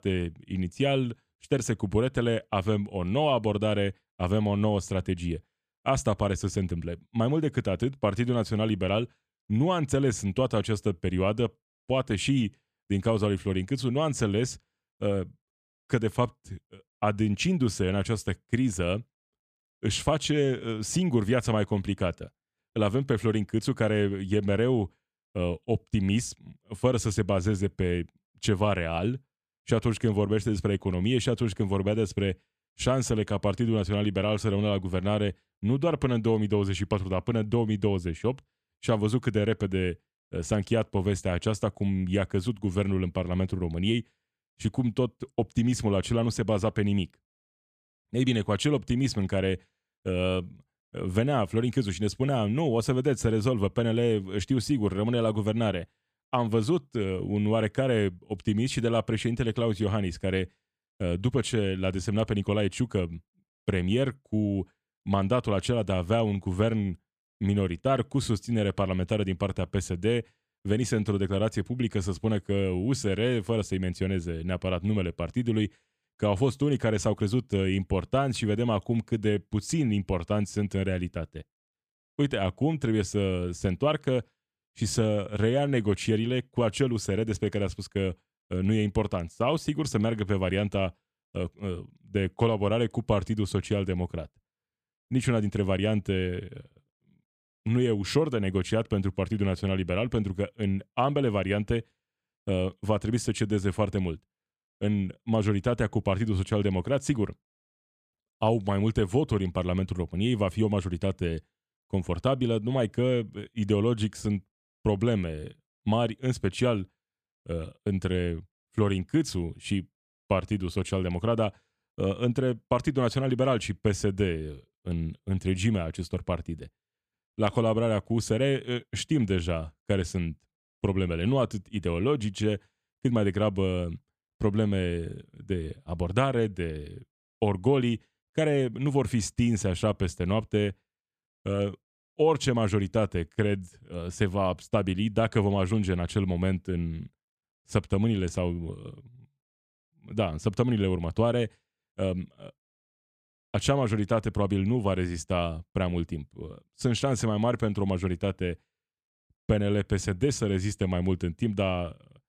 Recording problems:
none

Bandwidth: 14.5 kHz